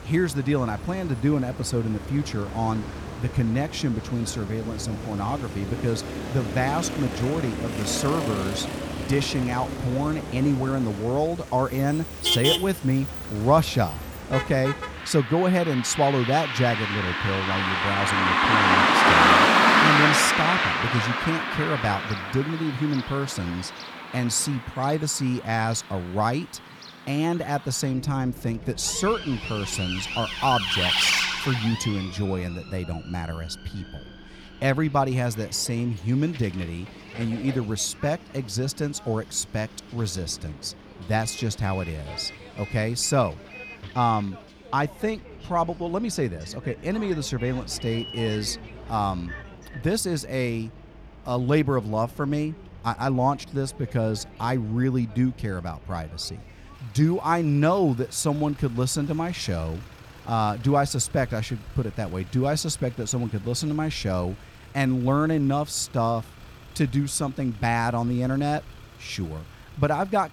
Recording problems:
traffic noise; very loud; throughout; 1 dB above the speech

